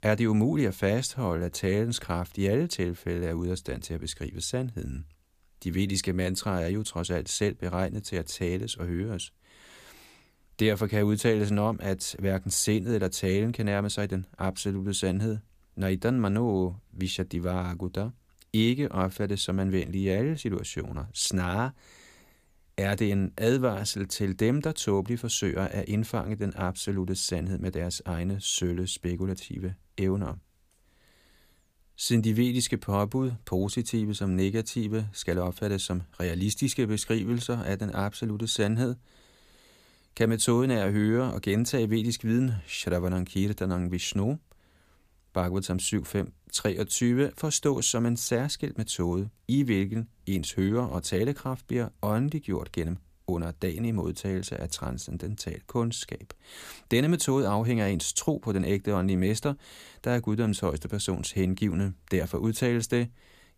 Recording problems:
none

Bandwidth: 15 kHz